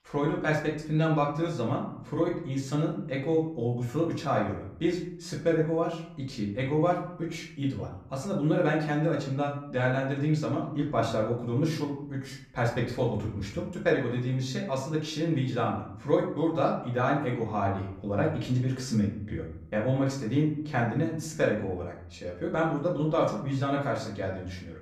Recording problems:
off-mic speech; far
room echo; slight; dies away in 0.6 s

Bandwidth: 14.5 kHz